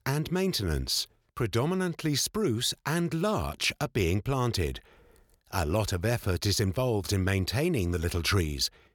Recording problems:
none

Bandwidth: 17.5 kHz